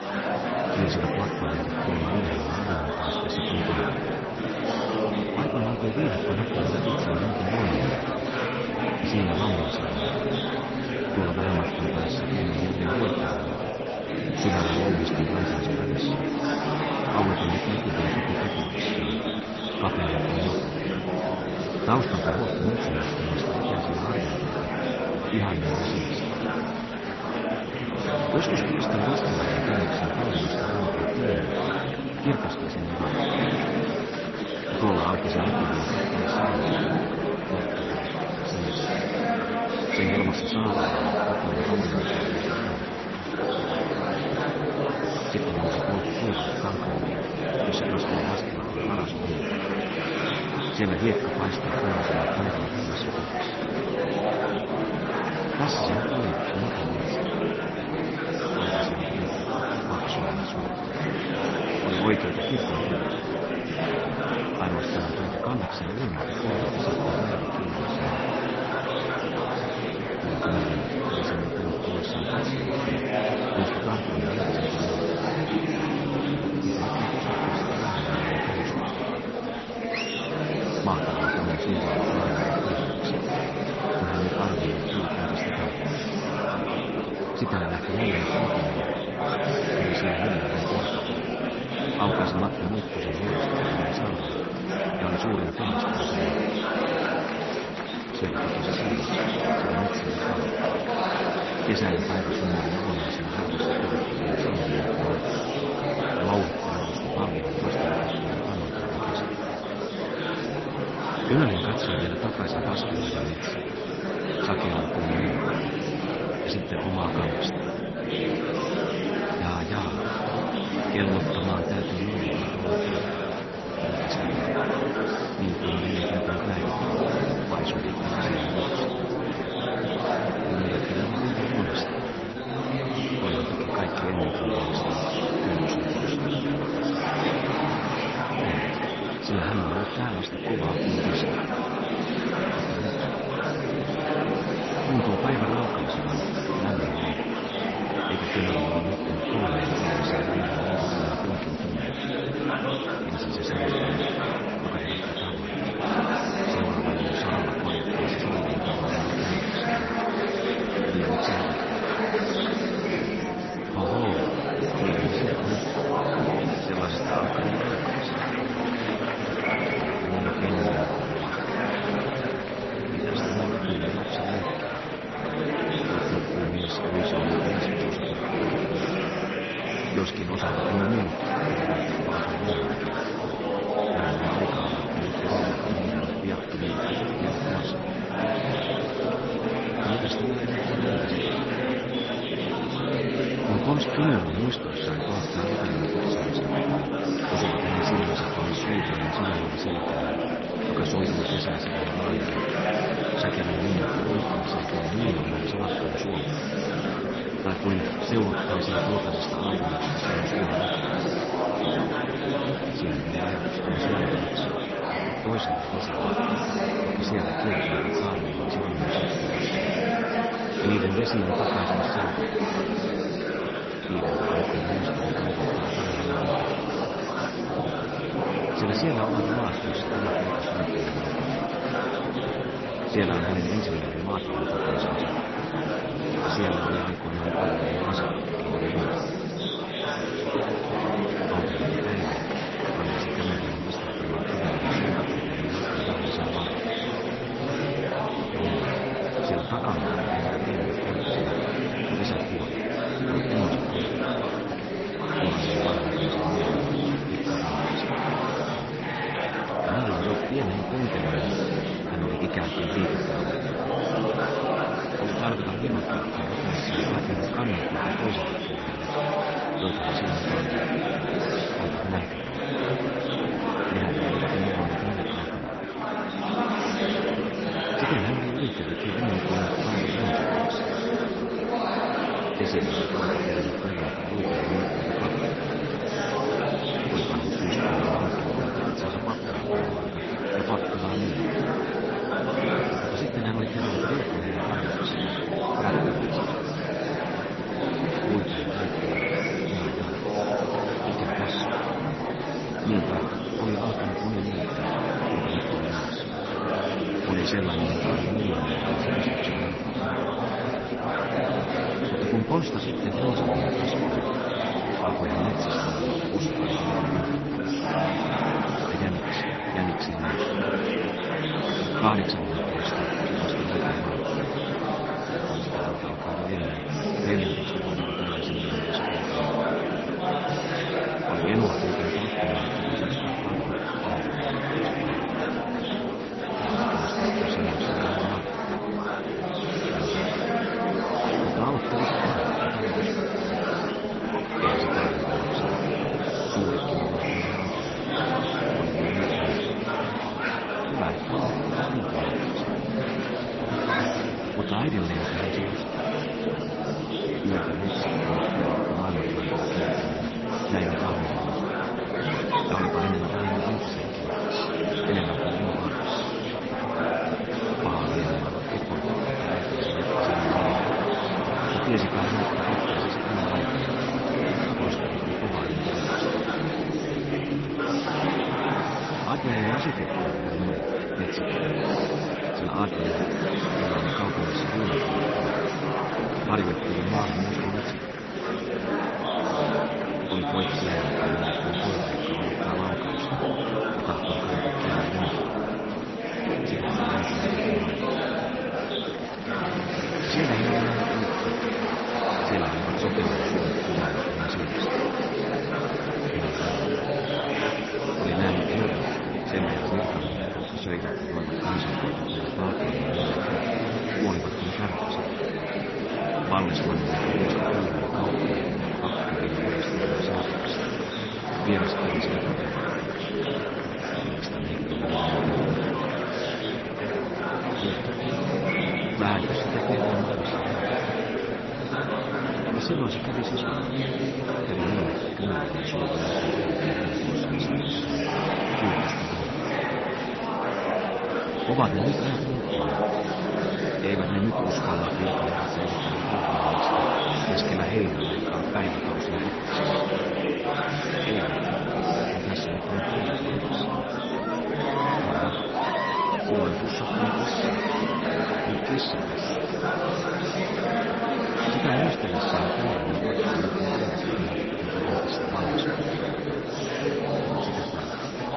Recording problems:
garbled, watery; slightly; nothing above 6 kHz
murmuring crowd; very loud; throughout; 4 dB above the speech

